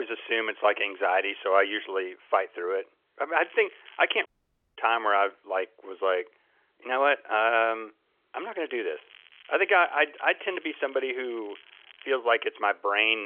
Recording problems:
phone-call audio; nothing above 3 kHz
crackling; faint; at 1 s, at 3.5 s and from 8.5 to 12 s; 25 dB below the speech
abrupt cut into speech; at the start and the end
audio cutting out; at 4.5 s for 0.5 s

